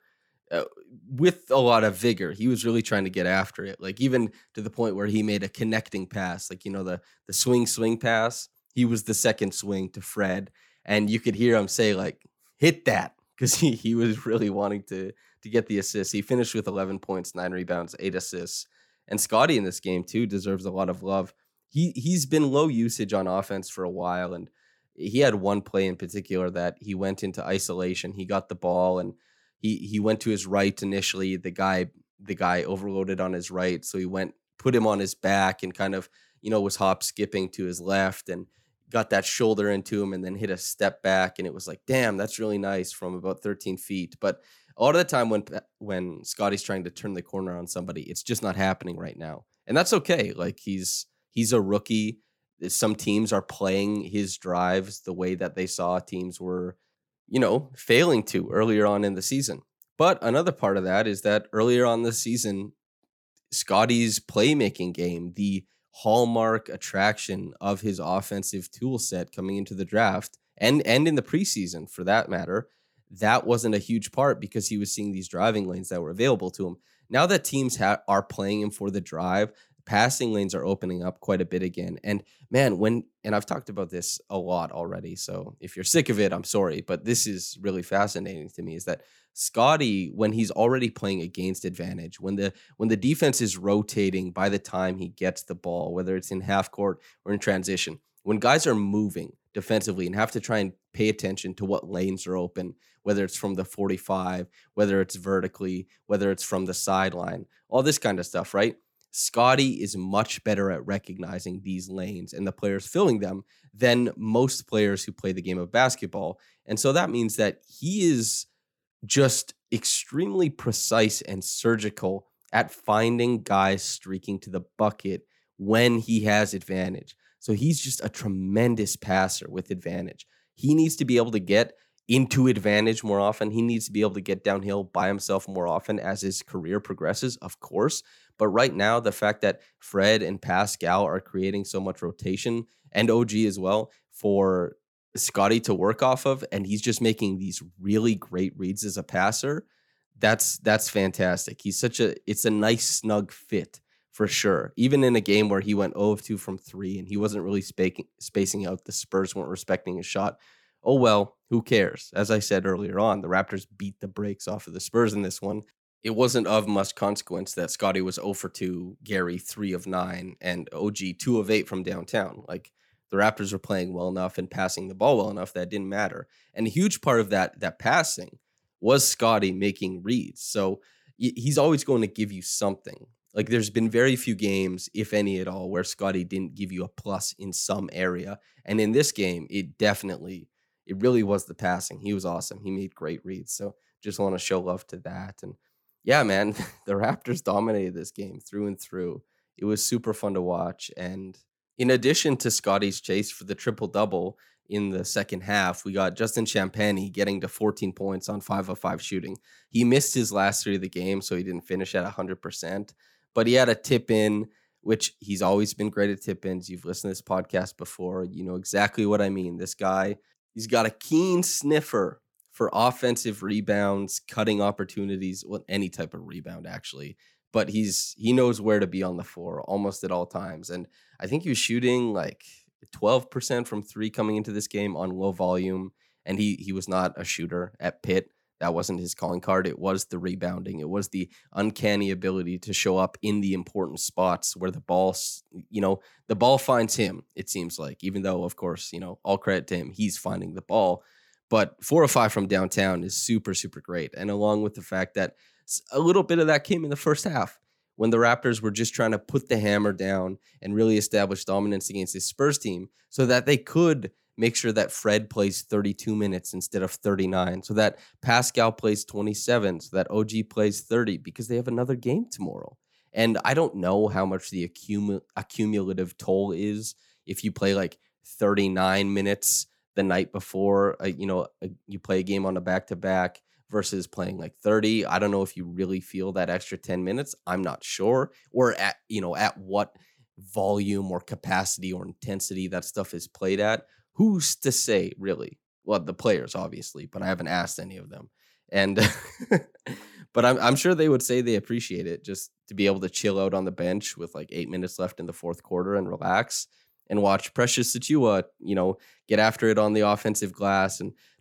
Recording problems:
none

